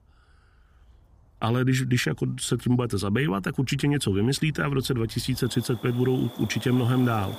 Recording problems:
animal sounds; noticeable; throughout; 20 dB below the speech

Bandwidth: 15 kHz